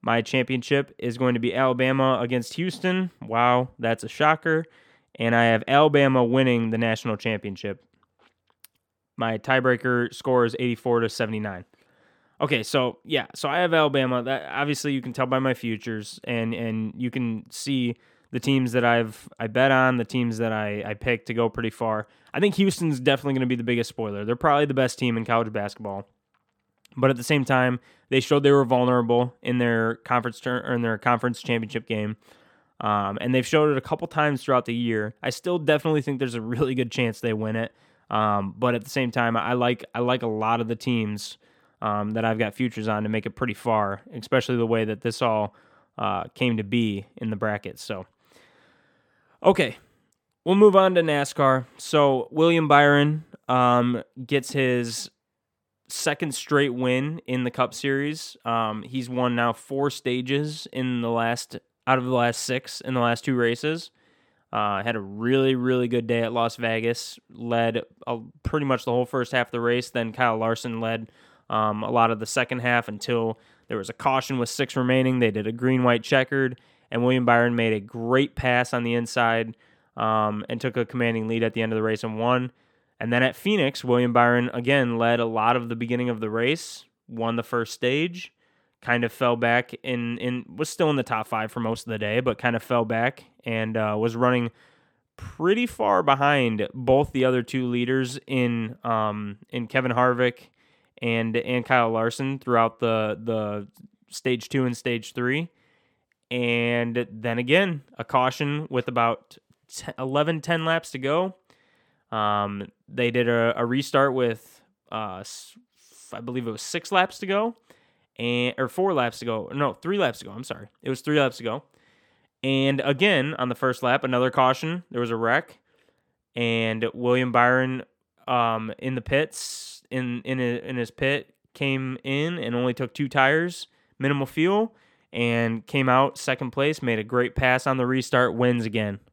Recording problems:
none

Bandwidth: 18 kHz